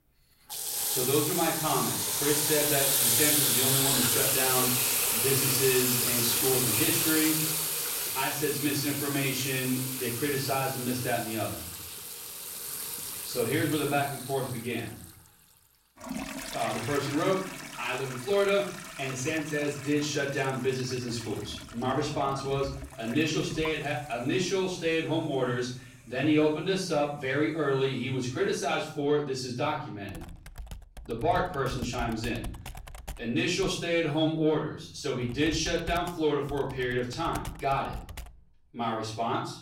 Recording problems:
off-mic speech; far
room echo; noticeable; dies away in 0.5 s
household noises; very loud; throughout; 2 dB above the speech

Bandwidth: 16 kHz